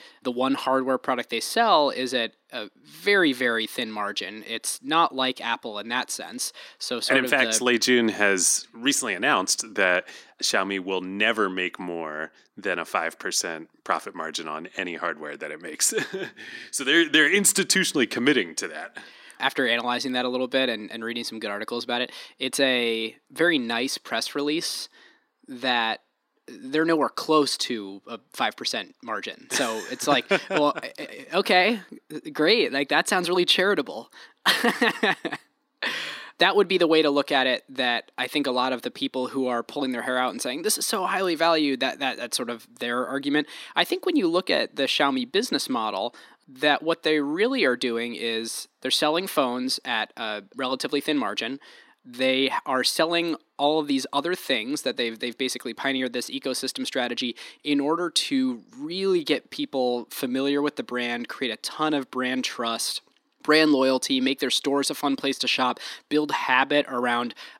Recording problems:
thin; very slightly; fading below 250 Hz

